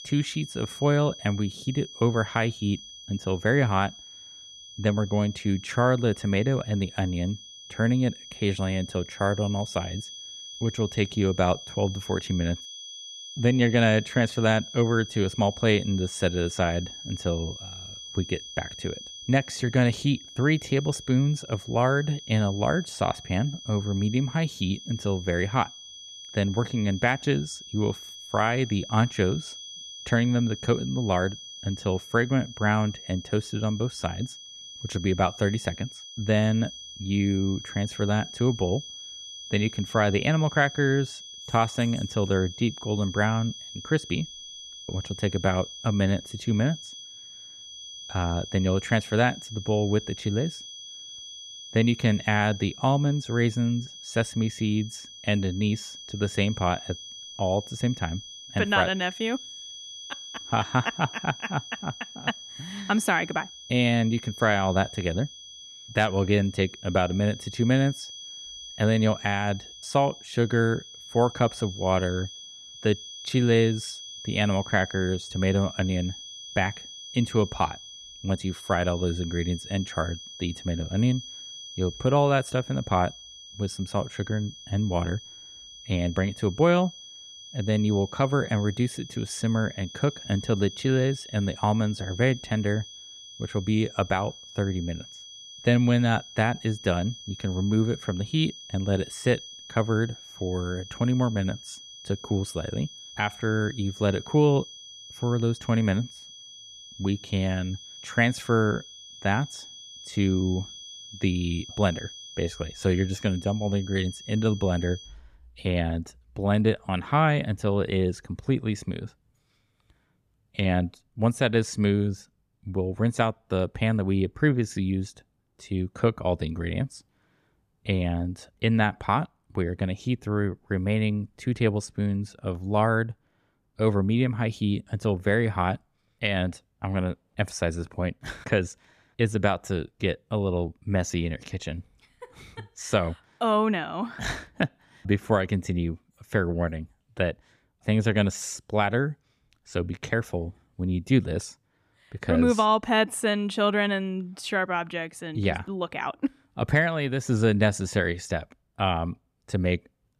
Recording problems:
high-pitched whine; noticeable; until 1:55; 3.5 kHz, 15 dB below the speech

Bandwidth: 14.5 kHz